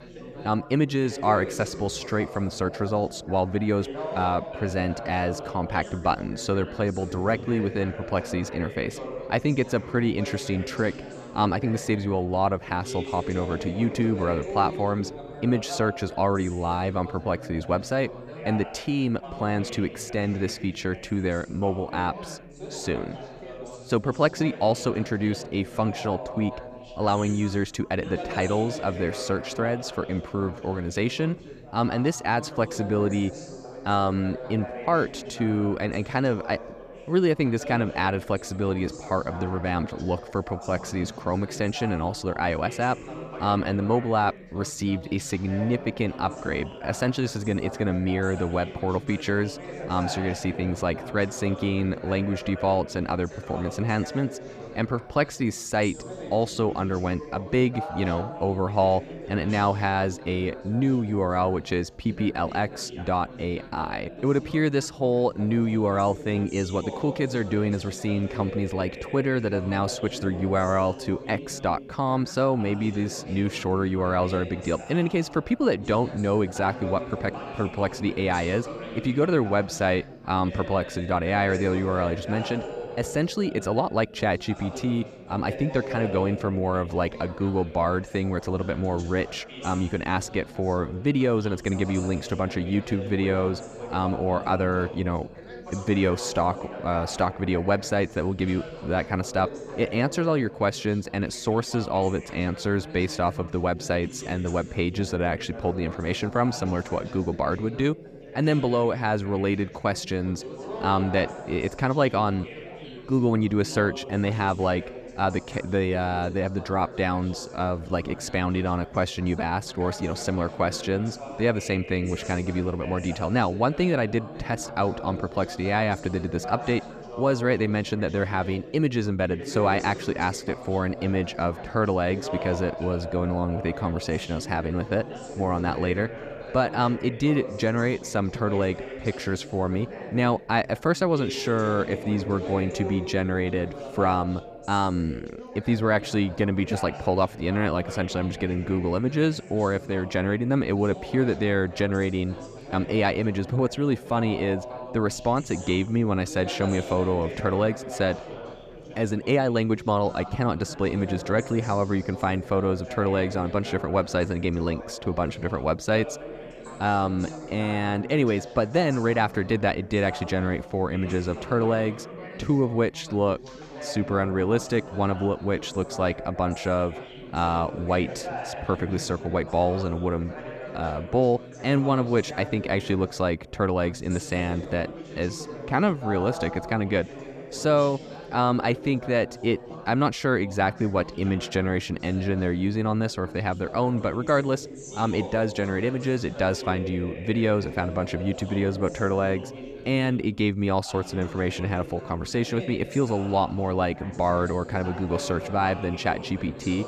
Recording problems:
background chatter; noticeable; throughout; 4 voices, 10 dB below the speech

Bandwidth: 14.5 kHz